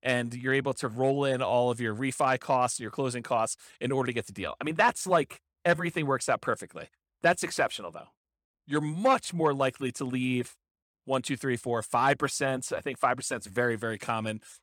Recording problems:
none

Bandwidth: 17 kHz